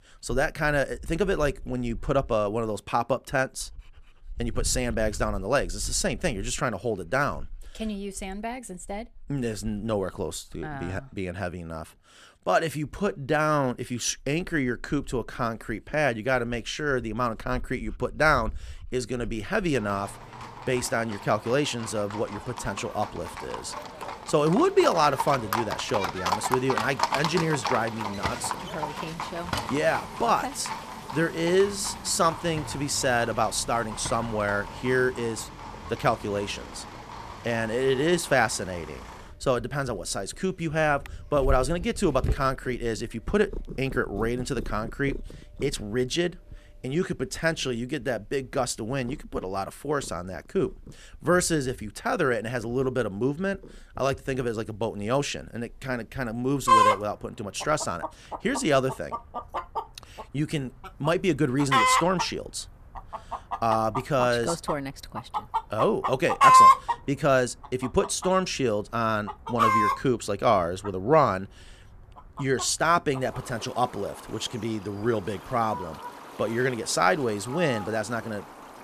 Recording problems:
animal sounds; loud; throughout; 3 dB below the speech

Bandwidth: 14.5 kHz